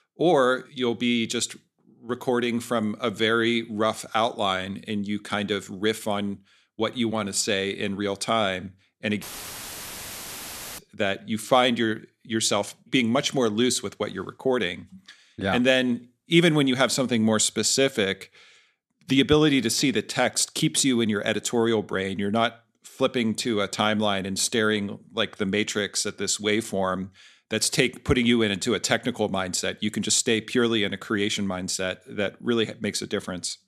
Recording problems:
audio cutting out; filled with static; at 9 s for 1.5 s

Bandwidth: 13.5 kHz